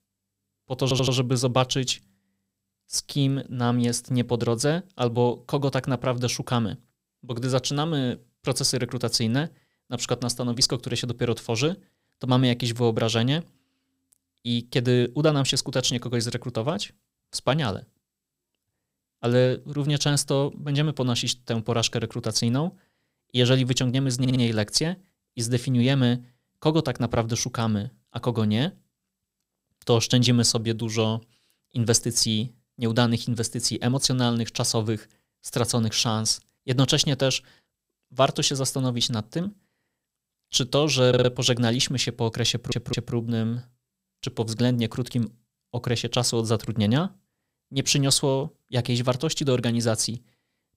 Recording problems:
audio stuttering; 4 times, first at 1 s

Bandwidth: 15.5 kHz